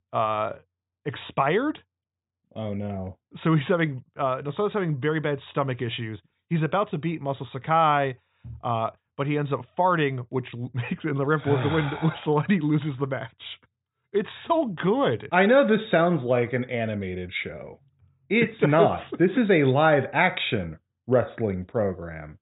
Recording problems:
high frequencies cut off; severe; nothing above 4 kHz

